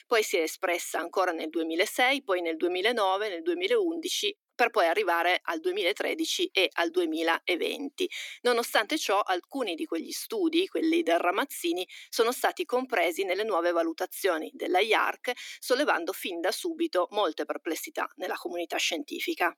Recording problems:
thin; somewhat; fading below 300 Hz

